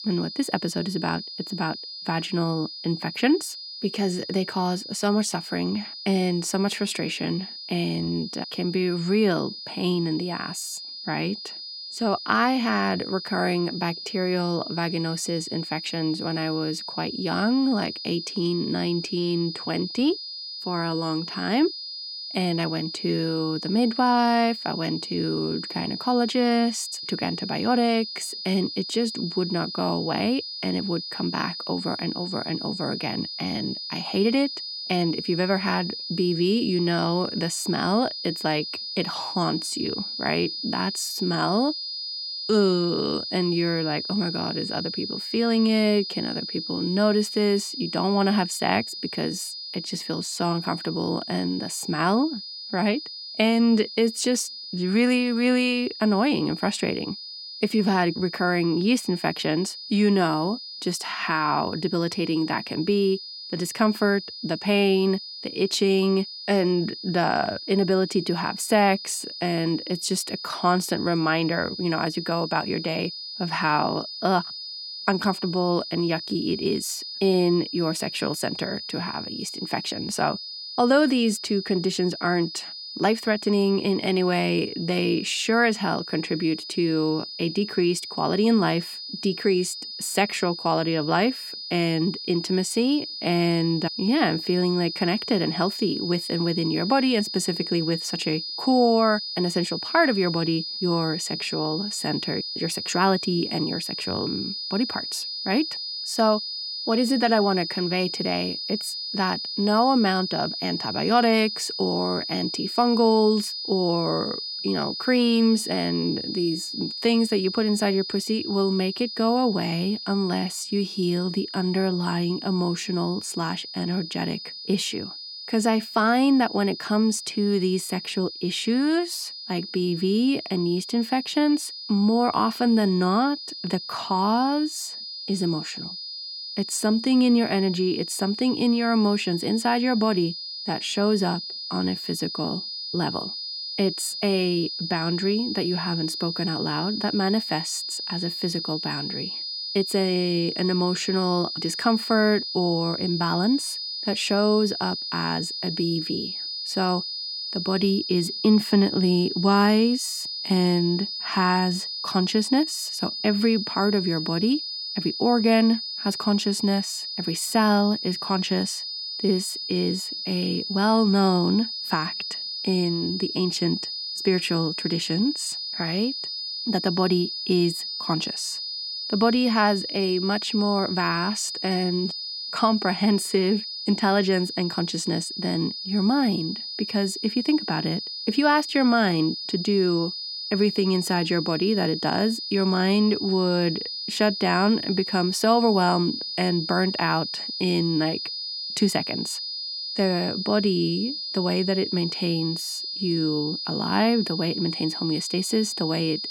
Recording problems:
high-pitched whine; loud; throughout; 5 kHz, 6 dB below the speech

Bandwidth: 17 kHz